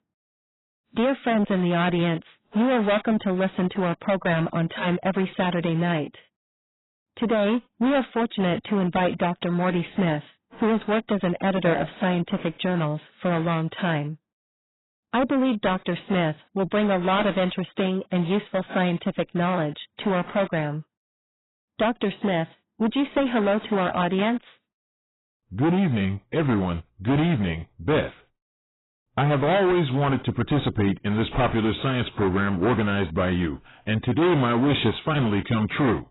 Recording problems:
distortion; heavy; 12% of the sound clipped
garbled, watery; badly; nothing above 4 kHz

